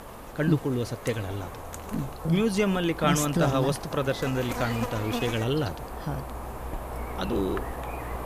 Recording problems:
electrical hum; loud; throughout; 50 Hz, 7 dB below the speech

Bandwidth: 14.5 kHz